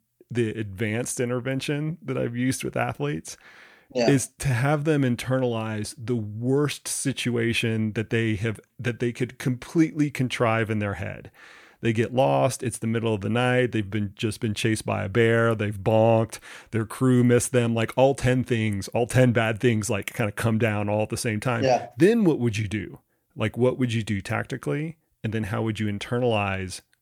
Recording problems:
none

